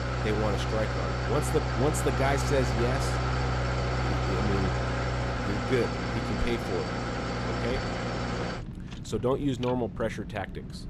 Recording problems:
traffic noise; very loud; throughout; 1 dB above the speech

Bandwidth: 14 kHz